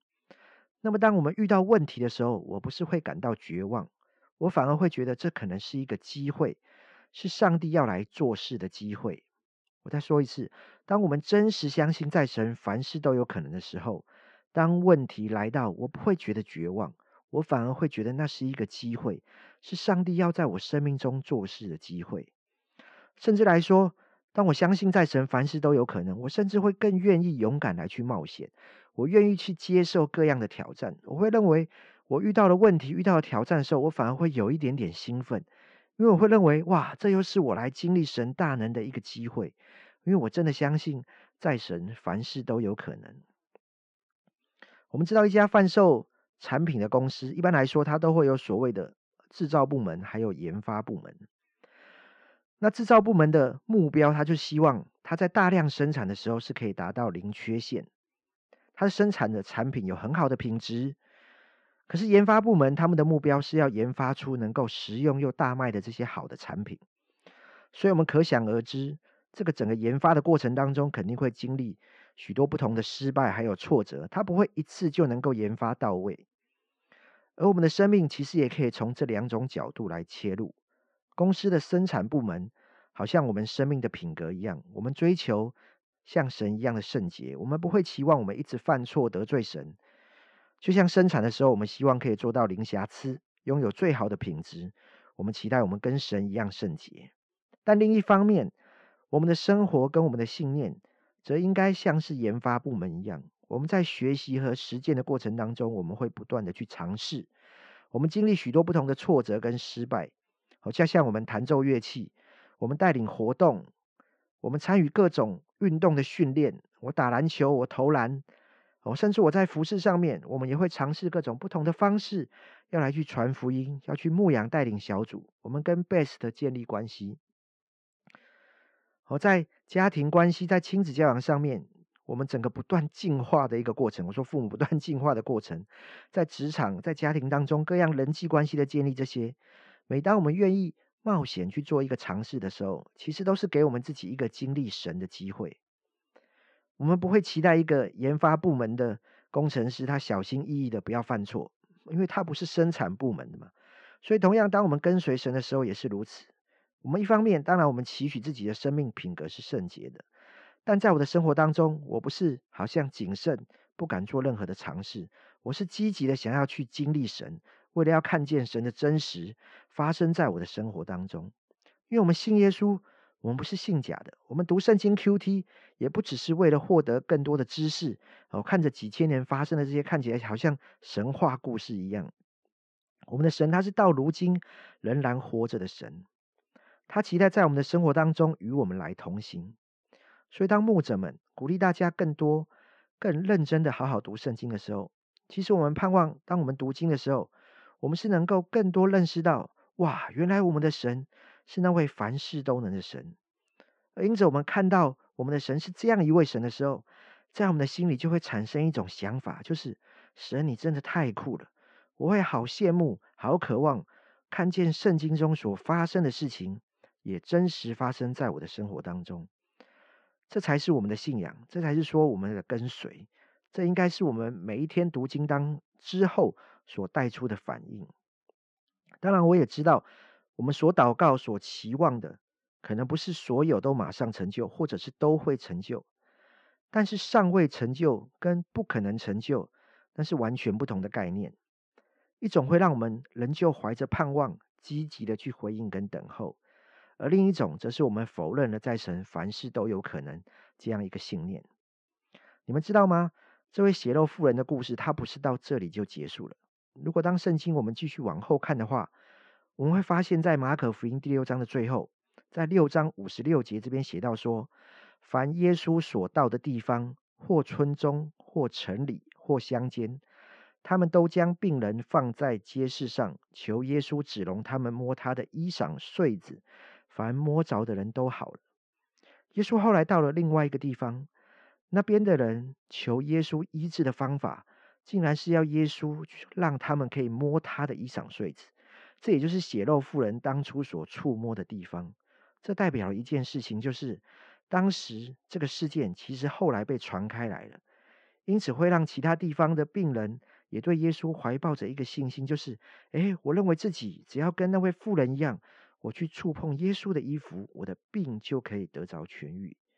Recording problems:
muffled; very; fading above 3 kHz

